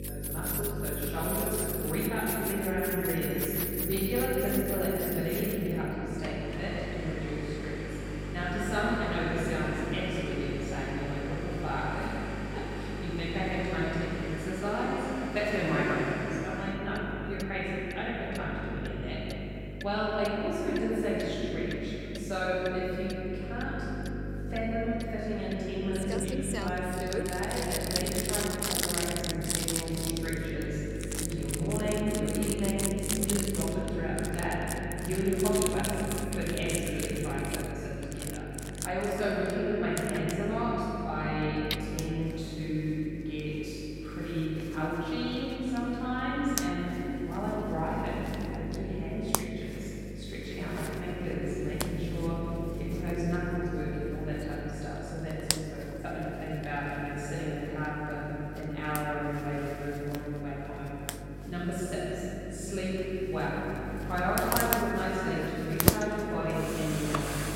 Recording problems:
room echo; strong; dies away in 3 s
off-mic speech; far
electrical hum; noticeable; throughout; 50 Hz, 15 dB below the speech
household noises; very faint; throughout; 3 dB below the speech

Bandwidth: 16 kHz